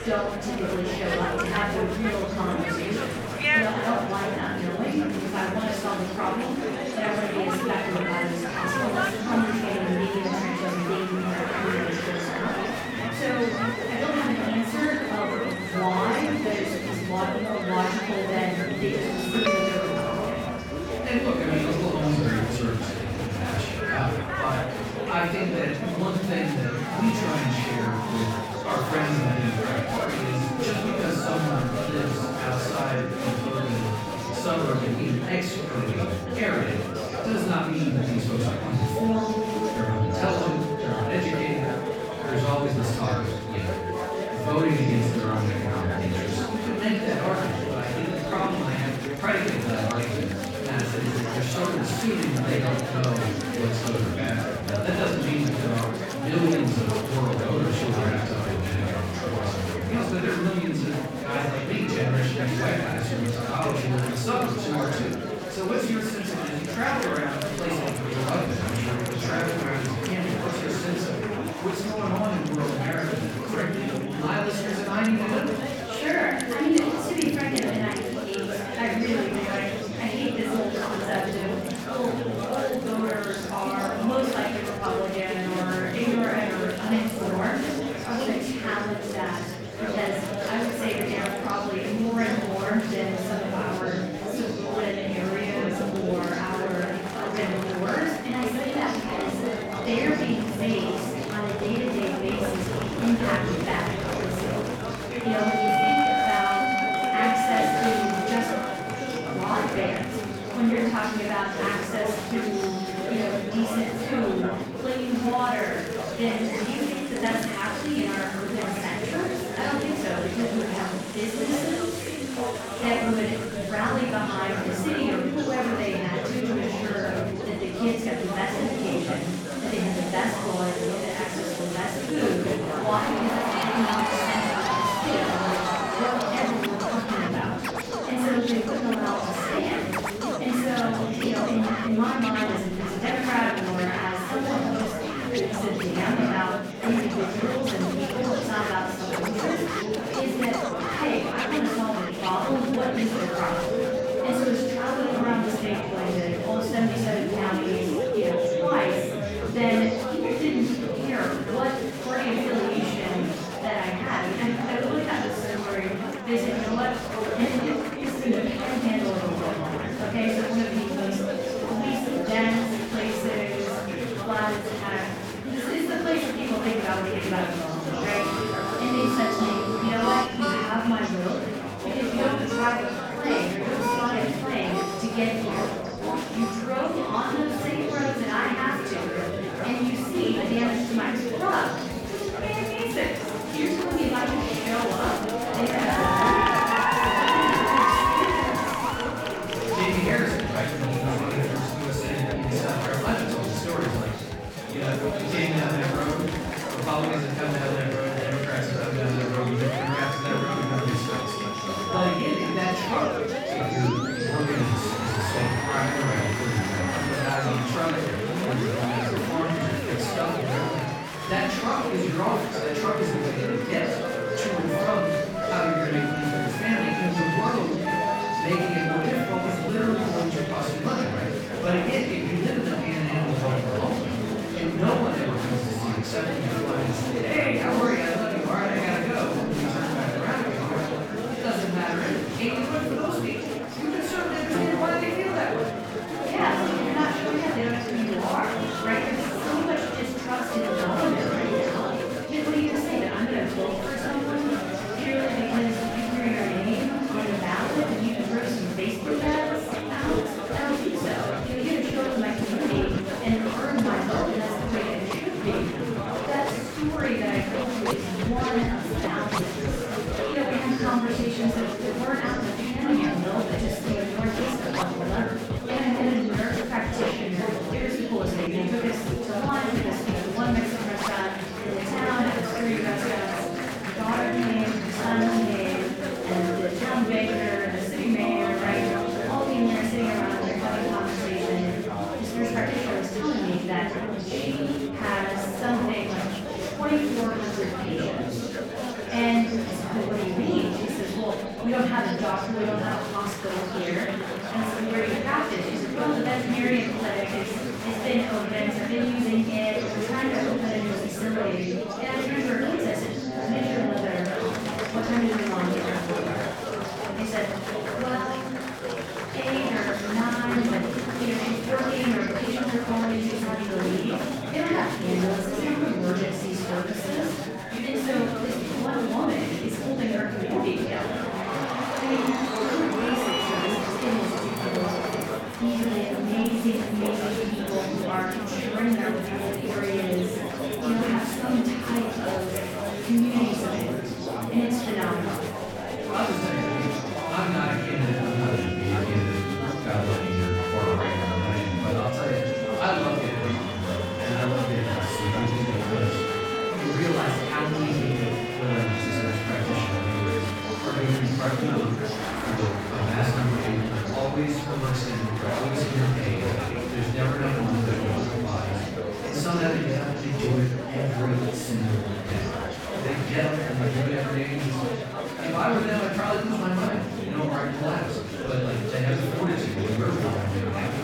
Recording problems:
off-mic speech; far
room echo; noticeable; dies away in 0.9 s
background music; loud; throughout; 6 dB below the speech
murmuring crowd; loud; throughout; 3 dB below the speech

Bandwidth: 17.5 kHz